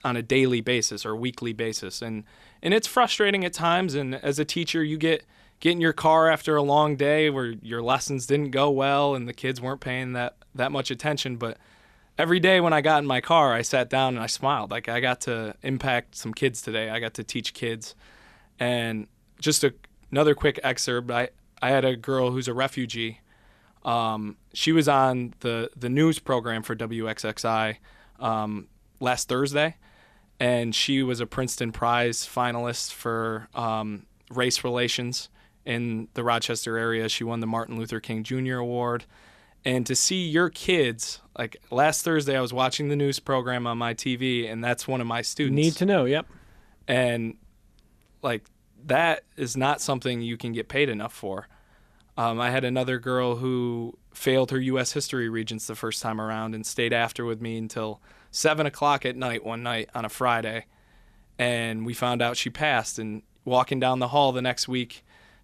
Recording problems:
none

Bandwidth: 14.5 kHz